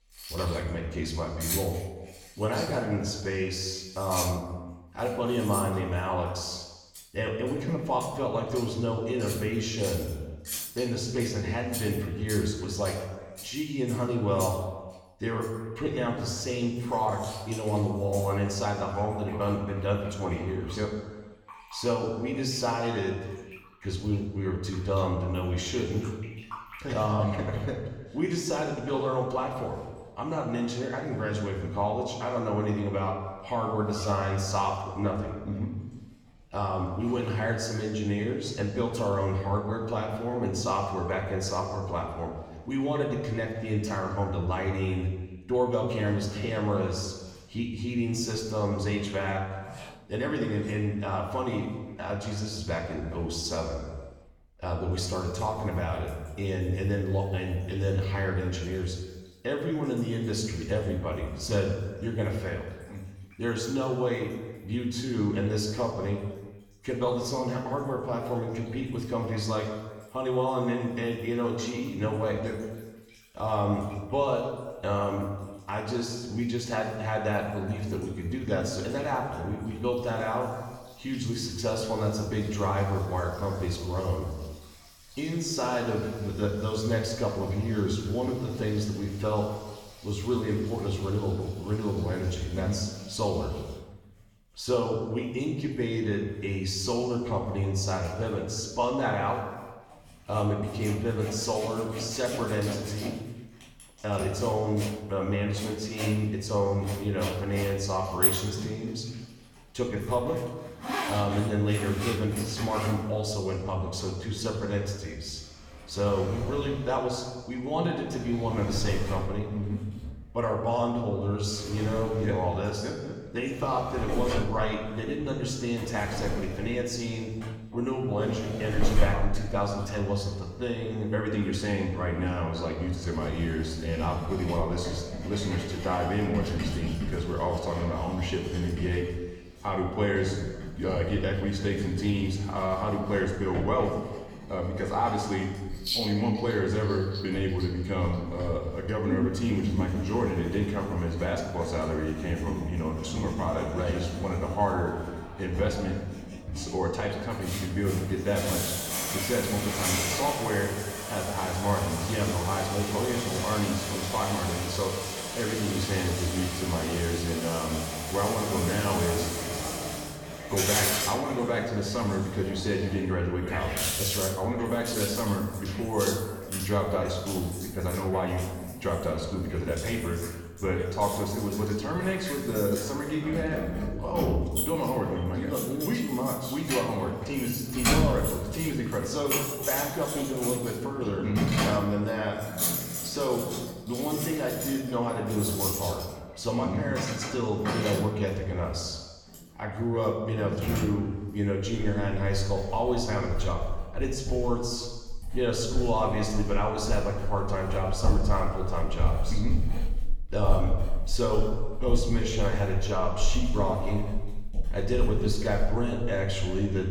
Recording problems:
room echo; noticeable; dies away in 1.2 s
off-mic speech; somewhat distant
household noises; loud; throughout; 5 dB below the speech

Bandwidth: 18 kHz